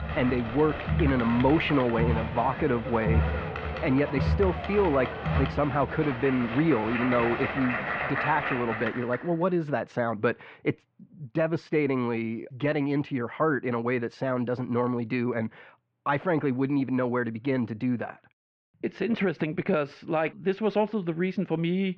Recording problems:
muffled; very; fading above 2.5 kHz
crowd noise; loud; until 9 s; 4 dB below the speech

